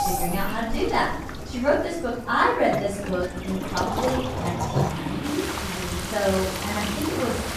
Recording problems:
off-mic speech; far
room echo; noticeable; dies away in 0.6 s
household noises; loud; throughout; 8 dB below the speech
rain or running water; loud; throughout; 5 dB below the speech
animal sounds; noticeable; throughout; 15 dB below the speech
background chatter; noticeable; throughout; 3 voices, 15 dB below the speech

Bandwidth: 14.5 kHz